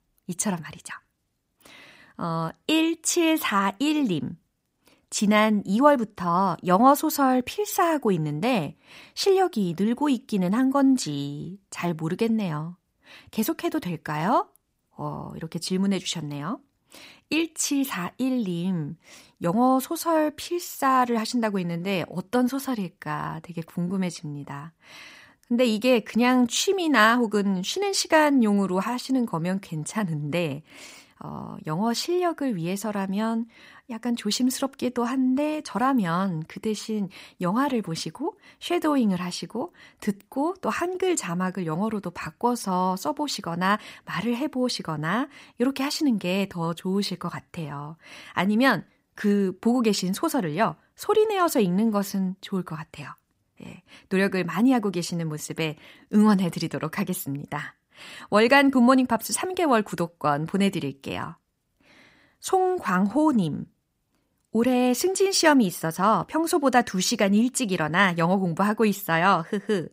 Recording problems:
none

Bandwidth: 15.5 kHz